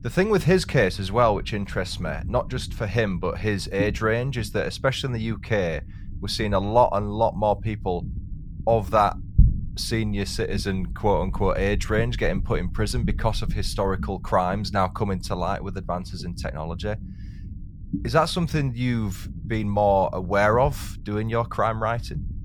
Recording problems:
low rumble; faint; throughout; 20 dB below the speech

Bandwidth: 18 kHz